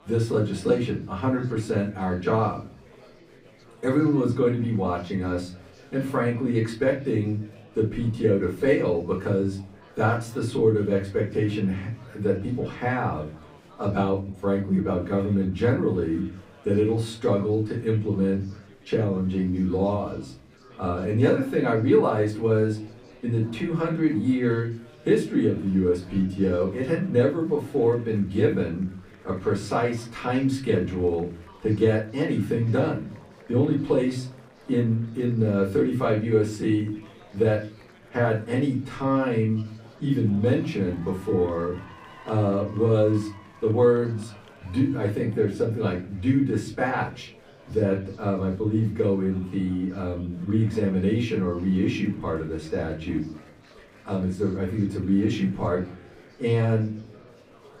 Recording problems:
off-mic speech; far
room echo; slight; dies away in 0.6 s
chatter from many people; faint; throughout; 25 dB below the speech

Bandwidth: 15.5 kHz